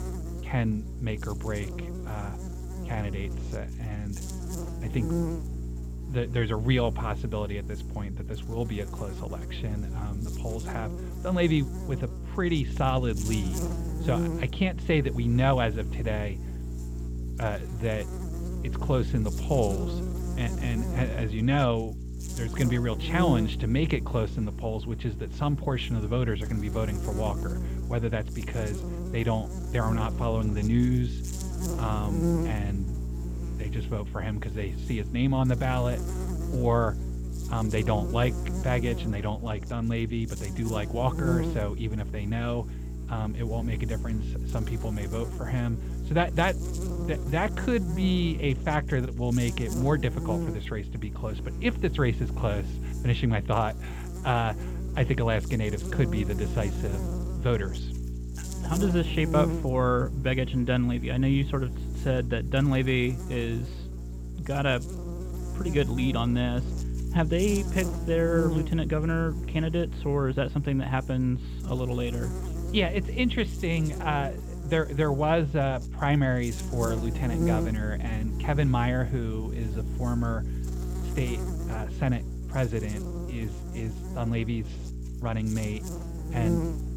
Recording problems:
muffled; very; fading above 3 kHz
electrical hum; noticeable; throughout; 60 Hz, 10 dB below the speech

